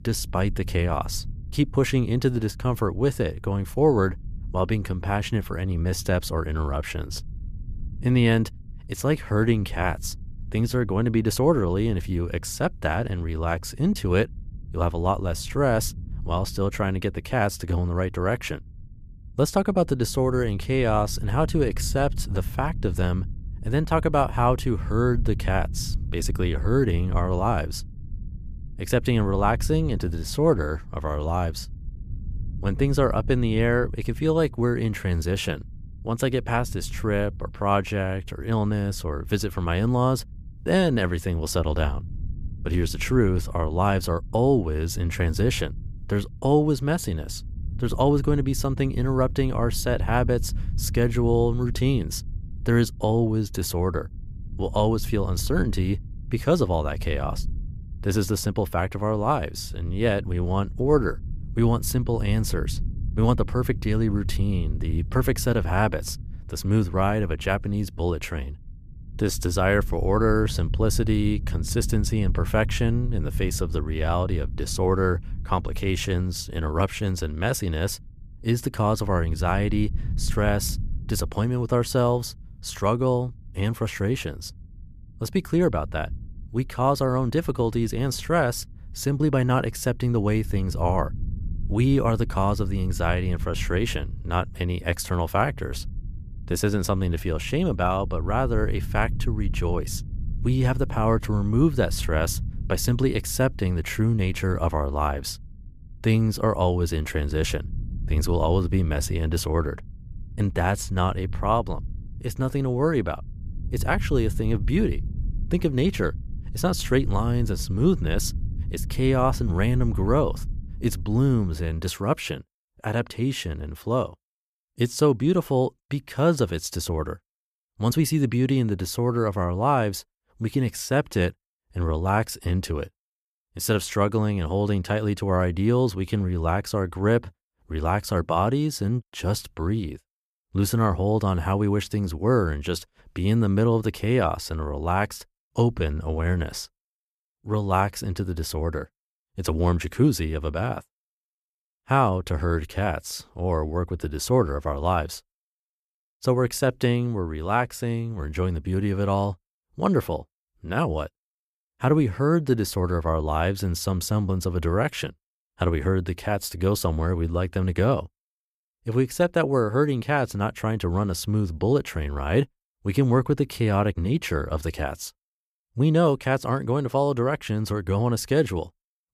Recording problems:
low rumble; faint; until 2:02; 25 dB below the speech

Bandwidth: 14.5 kHz